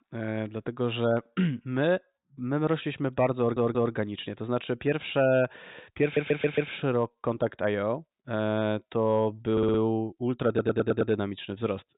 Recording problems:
high frequencies cut off; severe; nothing above 4 kHz
audio stuttering; 4 times, first at 3.5 s

